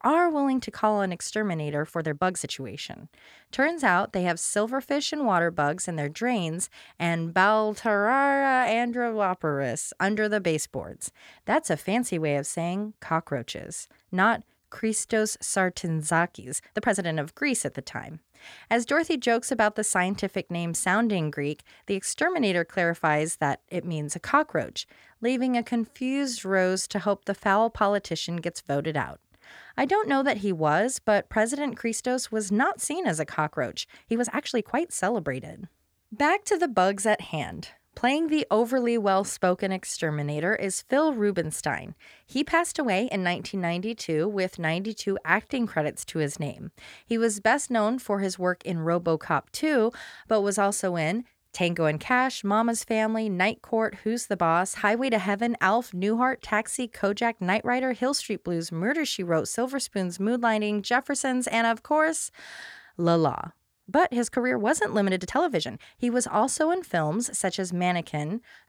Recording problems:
uneven, jittery; strongly; from 2 s to 1:06

